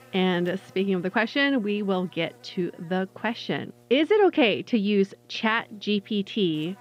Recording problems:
muffled; slightly; fading above 3.5 kHz
electrical hum; faint; throughout; 60 Hz, 30 dB below the speech

